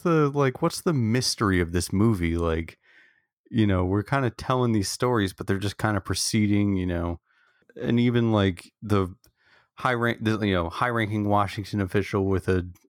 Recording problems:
none

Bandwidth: 17 kHz